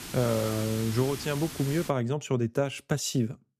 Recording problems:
hiss; loud; until 2 s; 9 dB below the speech

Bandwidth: 14.5 kHz